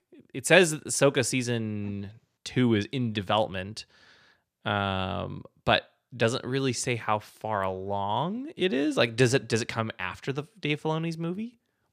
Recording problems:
none

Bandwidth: 14.5 kHz